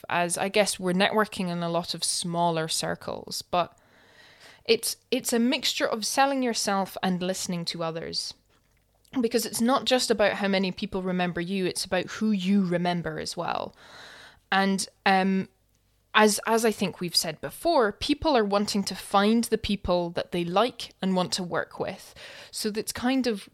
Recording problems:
none

